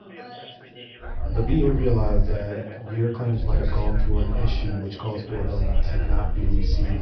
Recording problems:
off-mic speech; far
high frequencies cut off; noticeable; nothing above 5.5 kHz
room echo; slight; dies away in 0.4 s
background chatter; noticeable; throughout; 4 voices, 10 dB below the speech
low rumble; noticeable; from 1 to 2.5 s, from 3.5 to 4.5 s and from 5.5 s on; 15 dB below the speech
uneven, jittery; strongly; from 1 to 6.5 s

